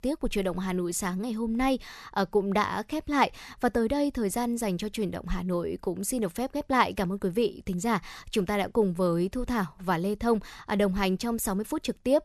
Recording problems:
none

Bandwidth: 13.5 kHz